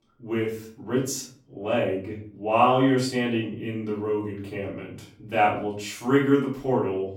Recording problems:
off-mic speech; far
room echo; slight; dies away in 0.4 s

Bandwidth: 17 kHz